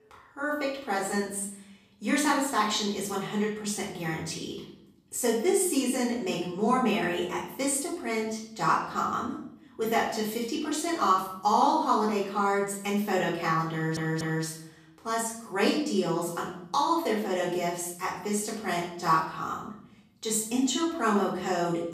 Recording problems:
off-mic speech; far
room echo; noticeable; dies away in 0.6 s
audio stuttering; at 14 s

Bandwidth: 14.5 kHz